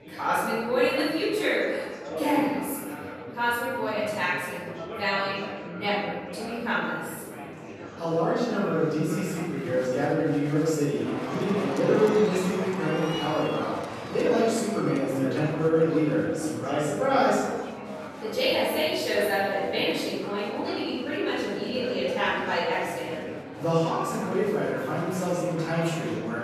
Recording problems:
room echo; strong; dies away in 1.4 s
off-mic speech; far
murmuring crowd; noticeable; throughout; 10 dB below the speech

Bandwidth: 13.5 kHz